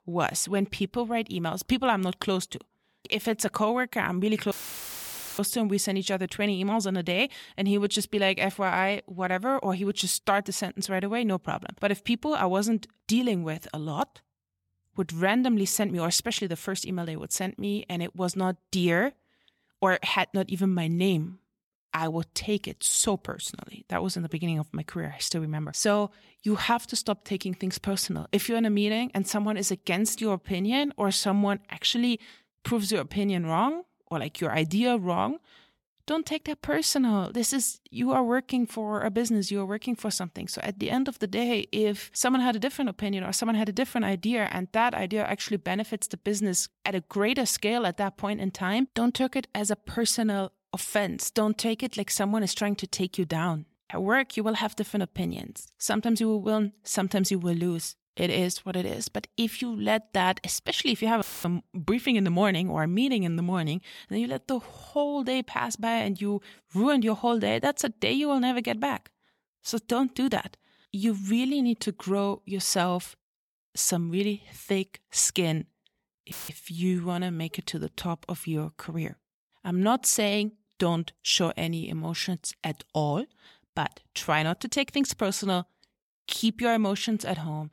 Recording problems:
audio cutting out; filled with static; at 4.5 s for 1 s, at 1:01 and at 1:16

